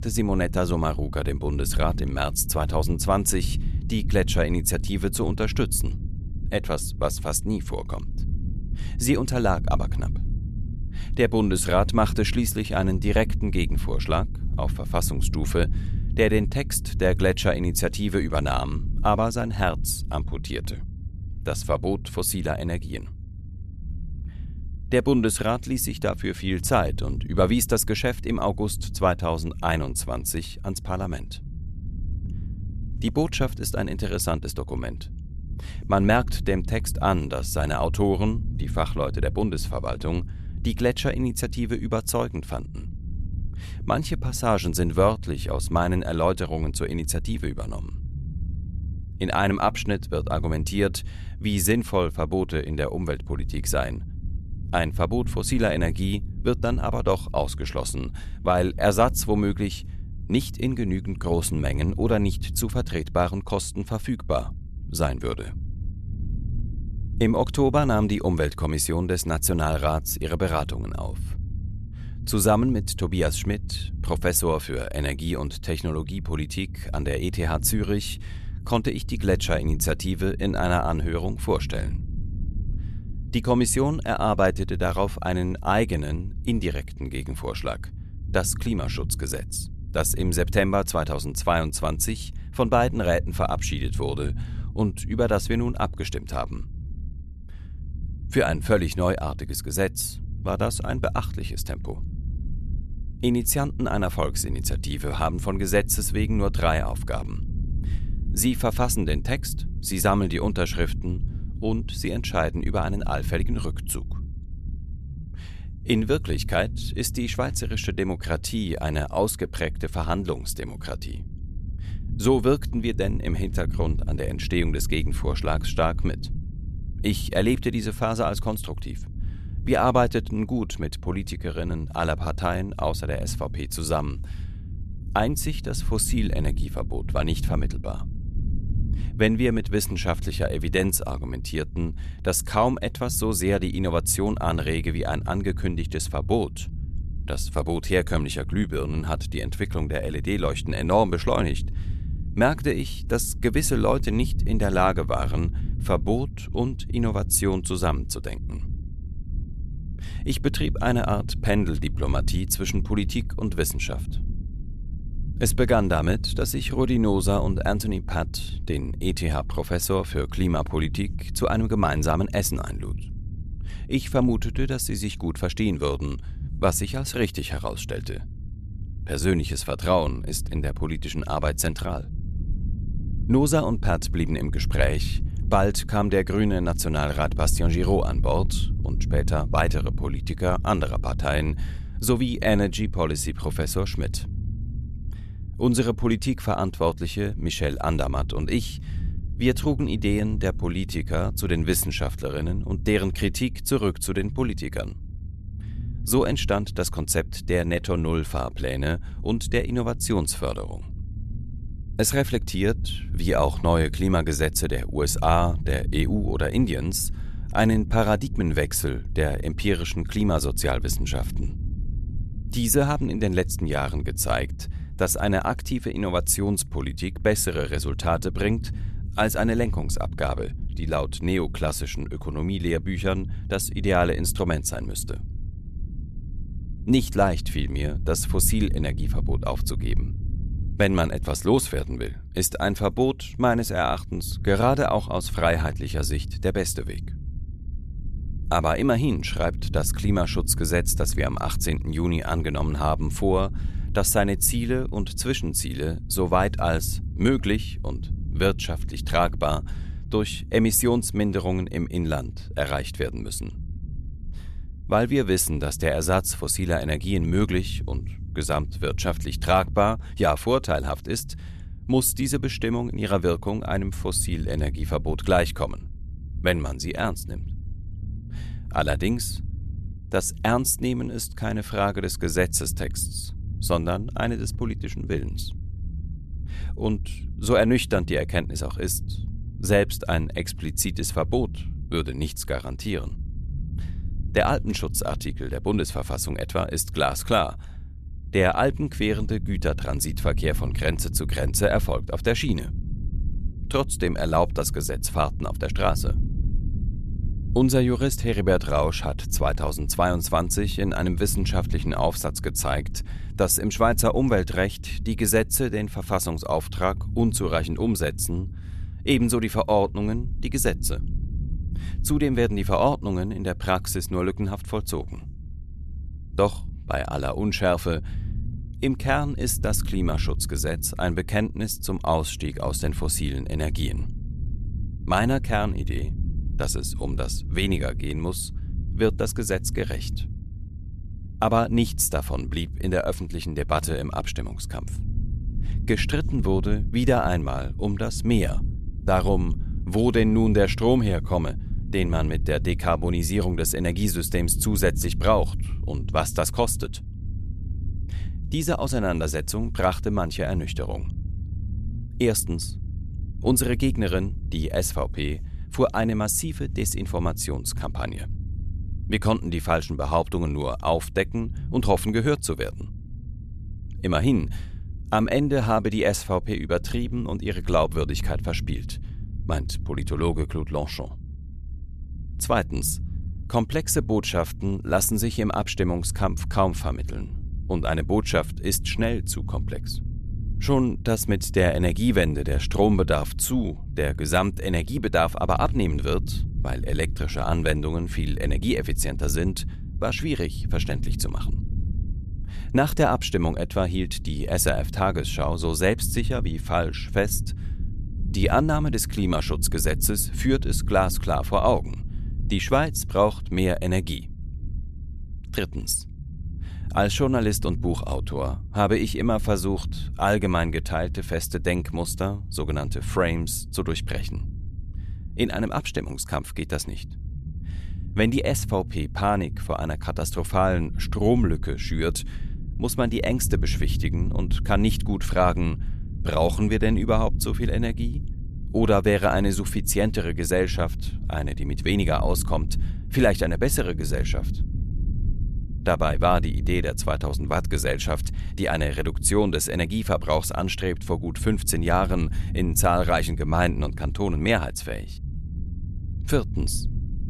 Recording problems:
low rumble; faint; throughout; 20 dB below the speech

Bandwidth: 13.5 kHz